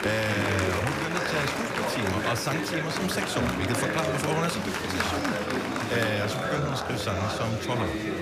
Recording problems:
murmuring crowd; very loud; throughout; 2 dB above the speech

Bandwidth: 14.5 kHz